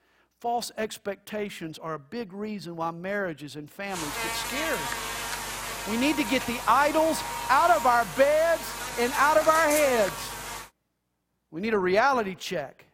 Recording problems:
electrical hum; loud; from 4 to 11 s; 50 Hz, 8 dB below the speech

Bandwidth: 16.5 kHz